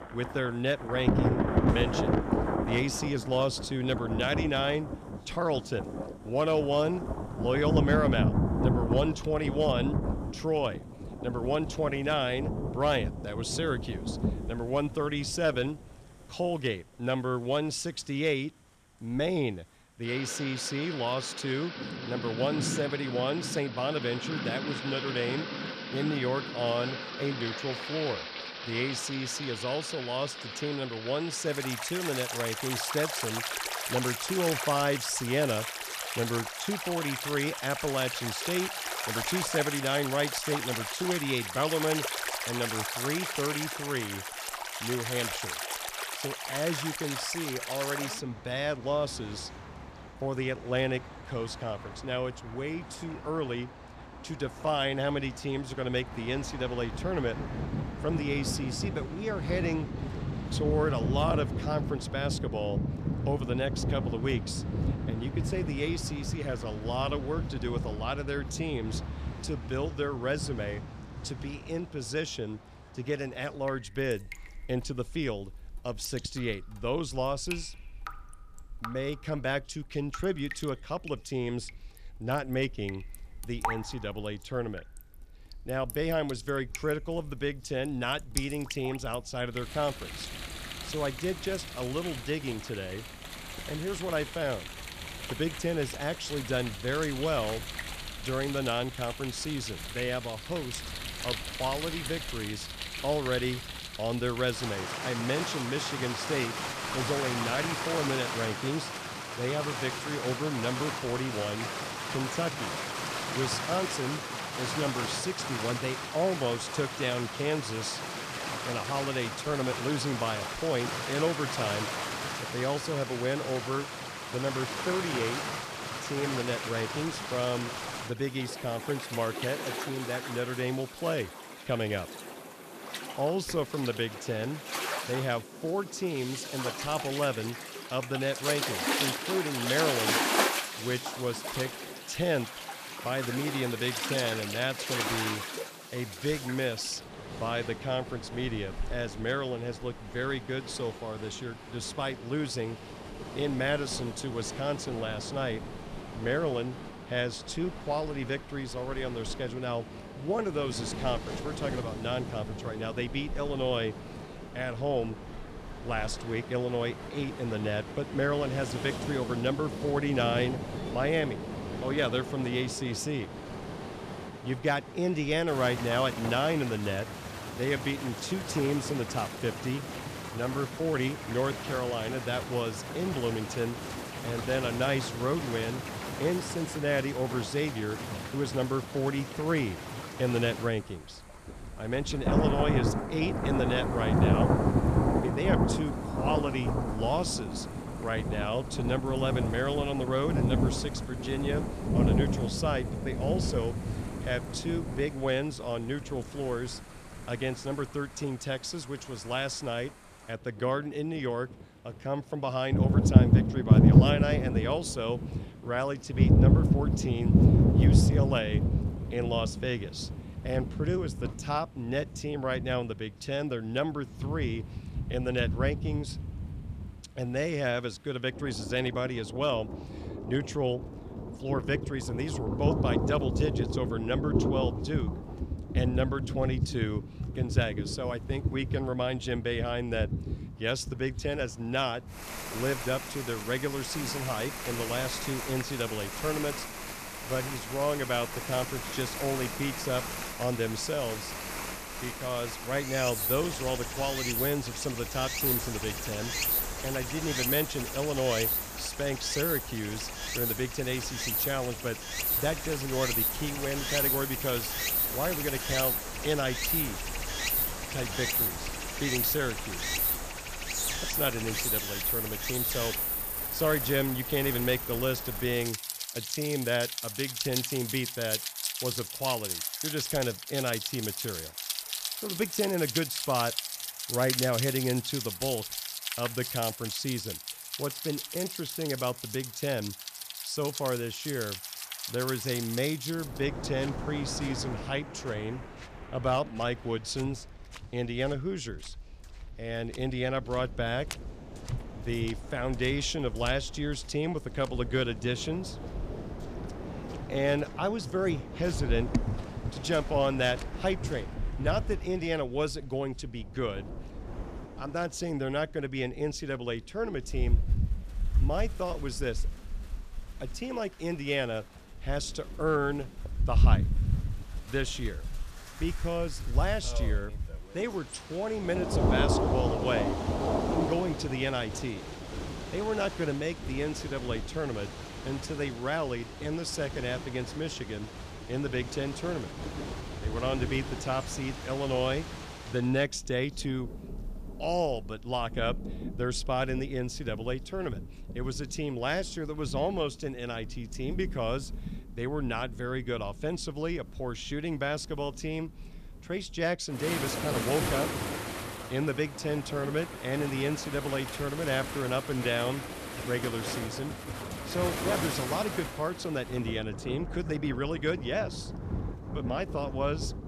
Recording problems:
rain or running water; loud; throughout; 1 dB below the speech

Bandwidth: 14.5 kHz